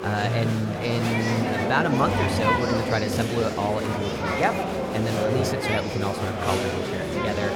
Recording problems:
murmuring crowd; very loud; throughout; 1 dB above the speech

